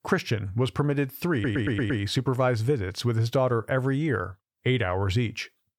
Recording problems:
audio stuttering; at 1.5 s

